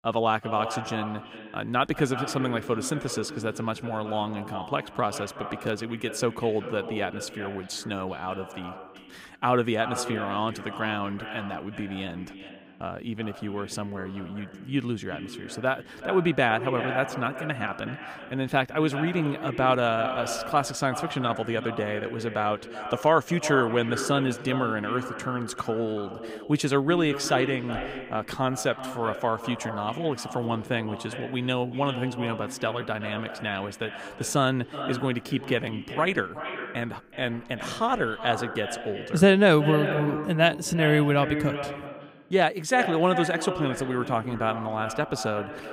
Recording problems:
echo of what is said; strong; throughout; 370 ms later, 9 dB below the speech

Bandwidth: 15.5 kHz